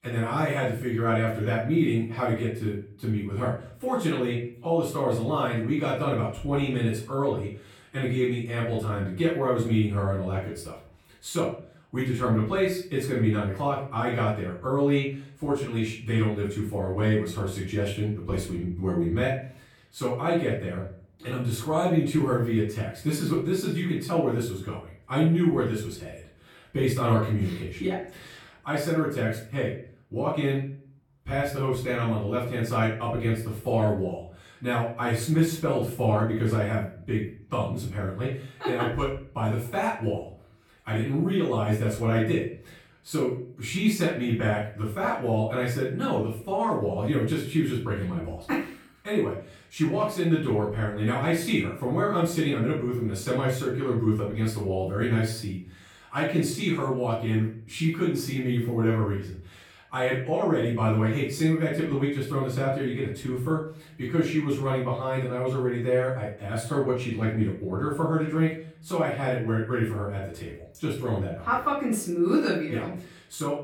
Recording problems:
off-mic speech; far
room echo; noticeable; dies away in 0.5 s

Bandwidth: 17 kHz